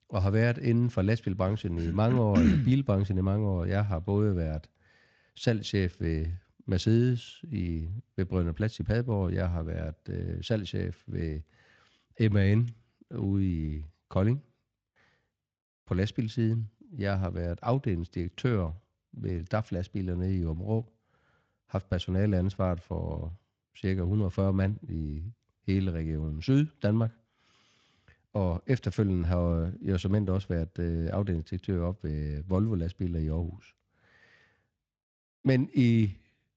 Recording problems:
garbled, watery; slightly; nothing above 7.5 kHz

